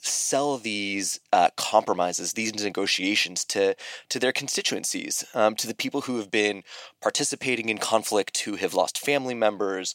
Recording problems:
thin; somewhat; fading below 400 Hz

